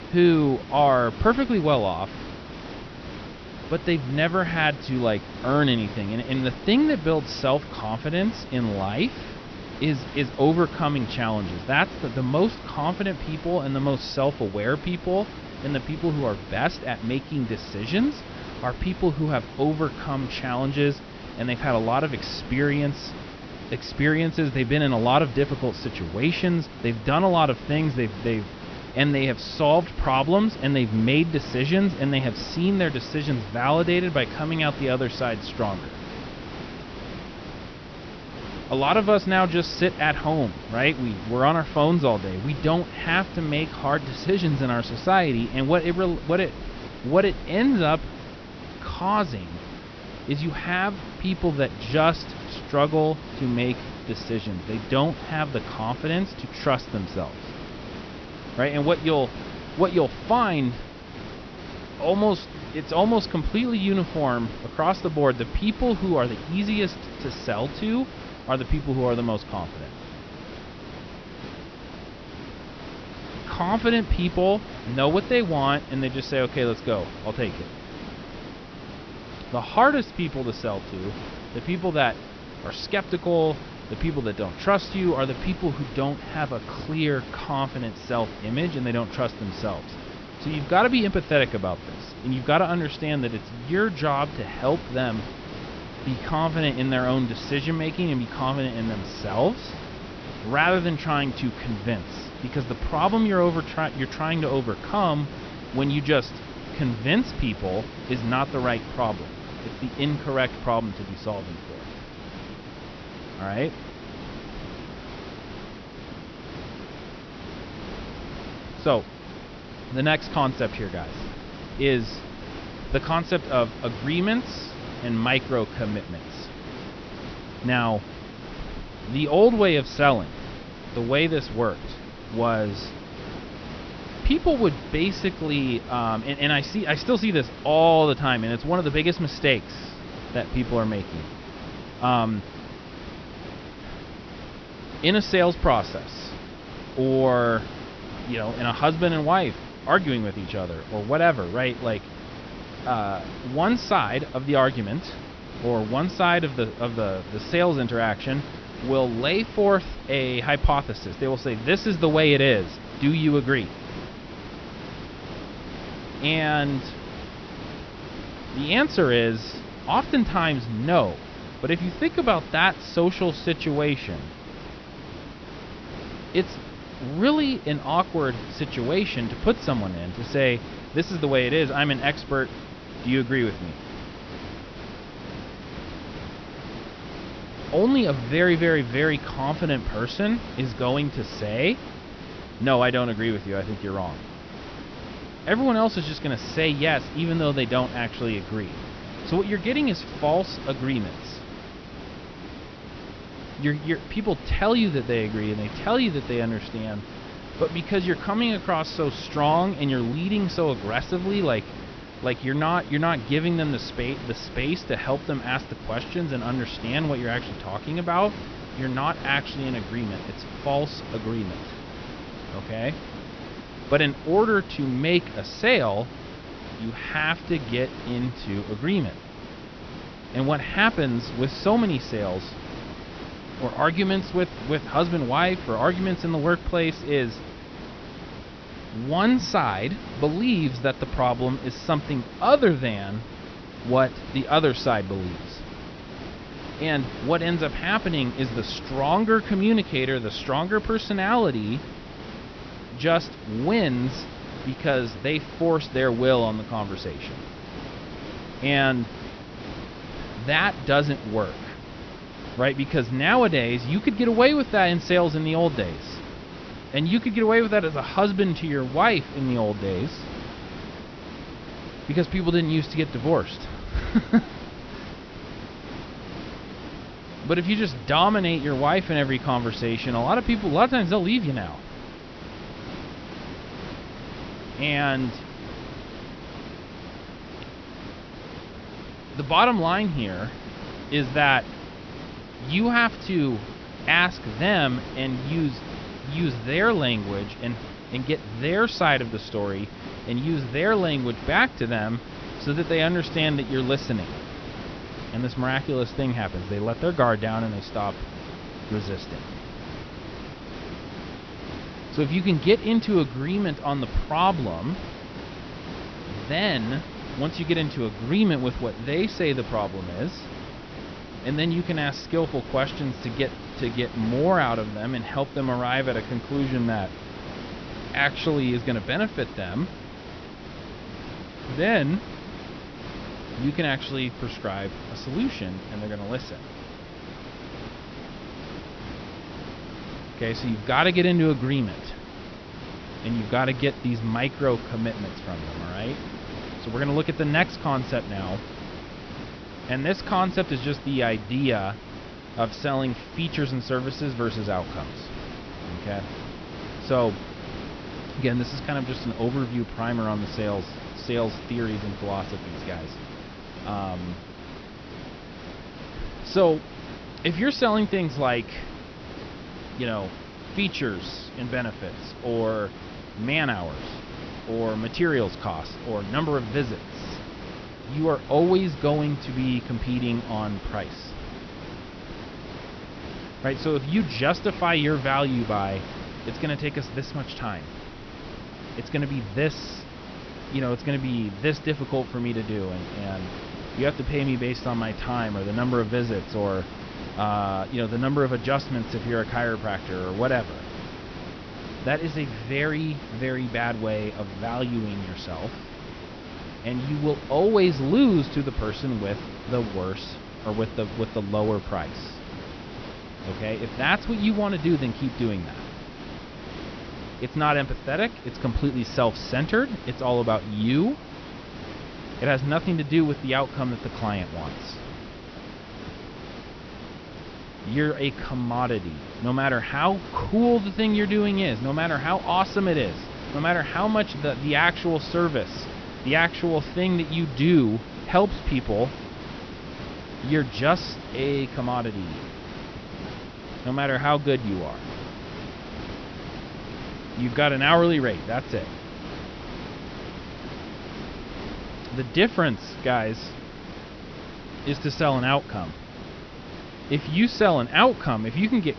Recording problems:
high frequencies cut off; noticeable; nothing above 6 kHz
hiss; noticeable; throughout; 15 dB below the speech

